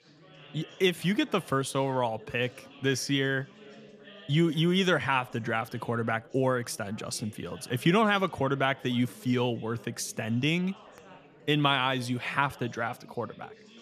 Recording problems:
chatter from many people; faint; throughout; 25 dB below the speech

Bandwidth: 14.5 kHz